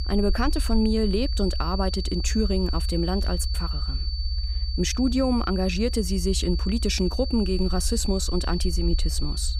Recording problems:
high-pitched whine; loud; throughout; 4.5 kHz, 8 dB below the speech
low rumble; faint; throughout; 20 dB below the speech

